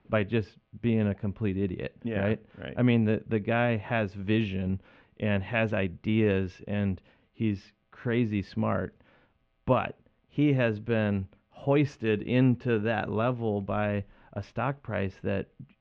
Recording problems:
muffled; very; fading above 3 kHz

